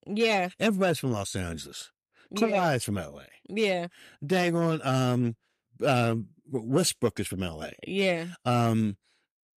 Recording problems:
none

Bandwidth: 14.5 kHz